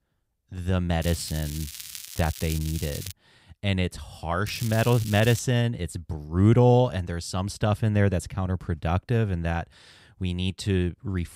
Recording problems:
crackling; noticeable; from 1 to 3 s and at 4.5 s; 10 dB below the speech

